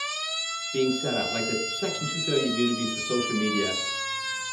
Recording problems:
room echo; slight; dies away in 0.8 s
off-mic speech; somewhat distant
siren; loud; peak 3 dB above the speech

